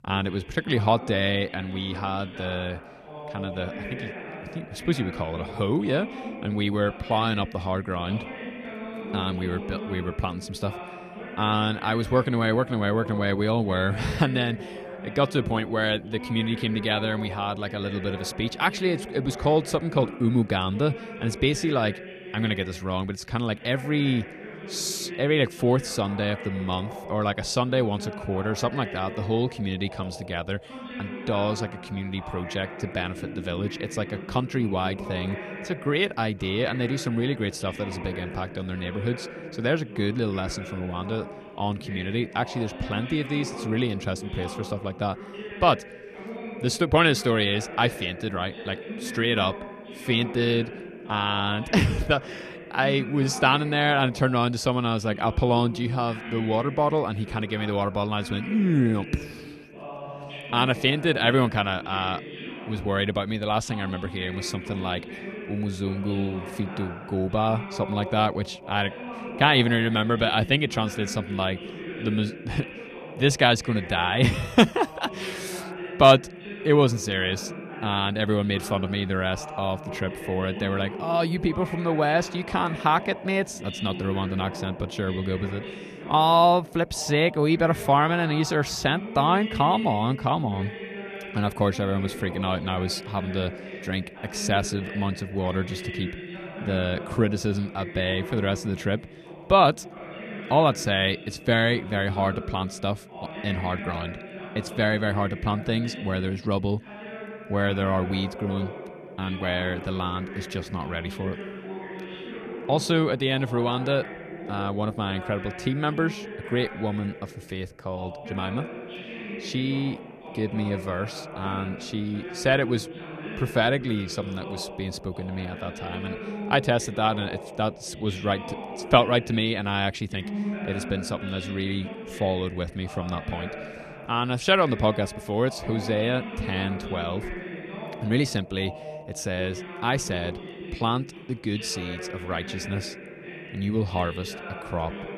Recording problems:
voice in the background; noticeable; throughout; 10 dB below the speech

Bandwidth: 14 kHz